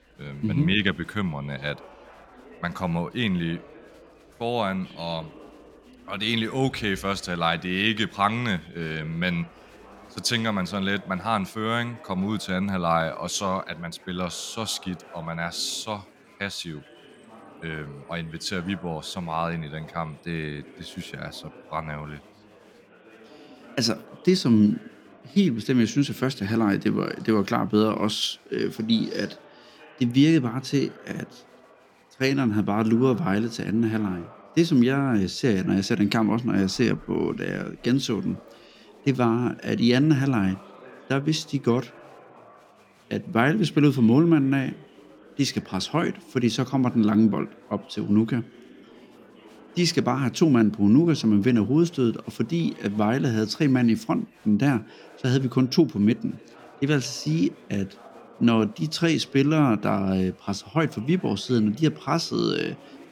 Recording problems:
chatter from many people; faint; throughout; 25 dB below the speech

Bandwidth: 17 kHz